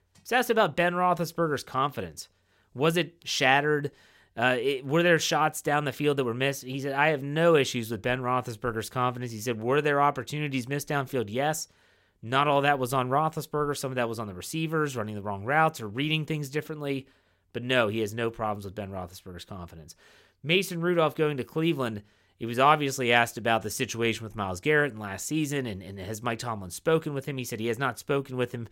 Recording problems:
none

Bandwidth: 16 kHz